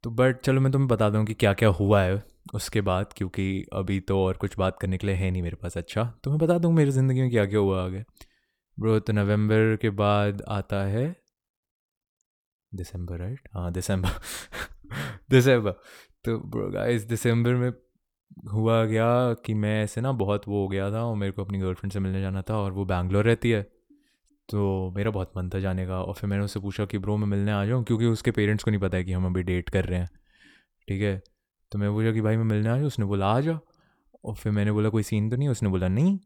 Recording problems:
none

